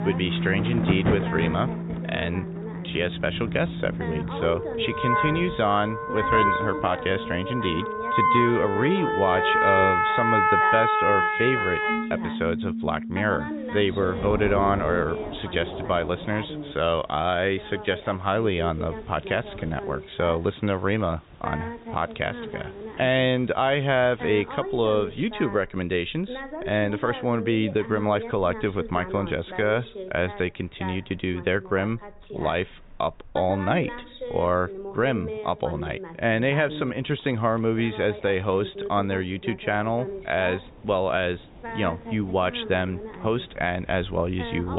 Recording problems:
high frequencies cut off; severe; nothing above 4 kHz
background music; very loud; until 15 s; as loud as the speech
rain or running water; noticeable; throughout; 15 dB below the speech
voice in the background; noticeable; throughout; 10 dB below the speech
abrupt cut into speech; at the end

